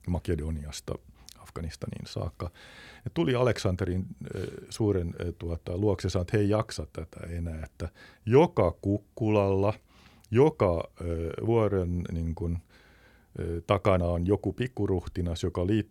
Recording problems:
none

